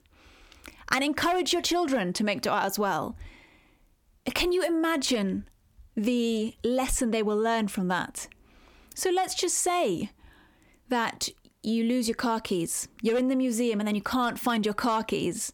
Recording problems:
squashed, flat; heavily

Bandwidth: 18 kHz